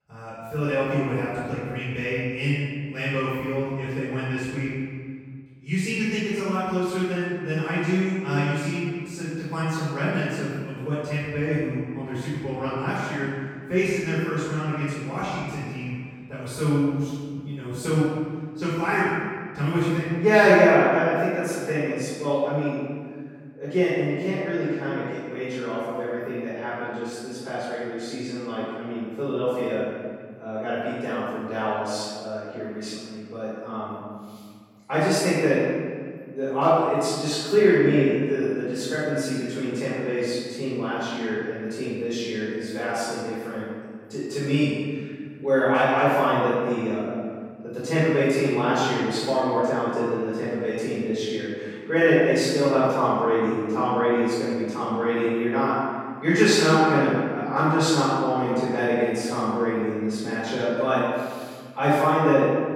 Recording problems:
room echo; strong; dies away in 1.7 s
off-mic speech; far

